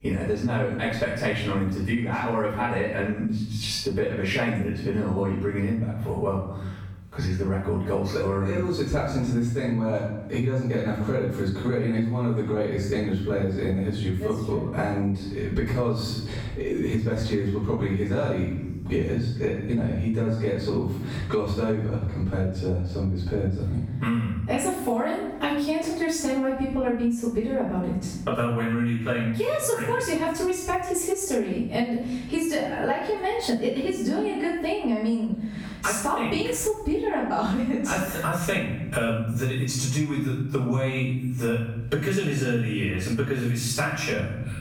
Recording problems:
off-mic speech; far
room echo; noticeable; dies away in 0.7 s
squashed, flat; somewhat

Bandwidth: 17.5 kHz